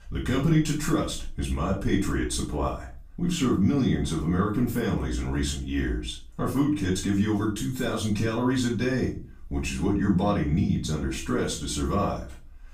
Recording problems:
off-mic speech; far
room echo; slight; dies away in 0.3 s

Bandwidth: 15.5 kHz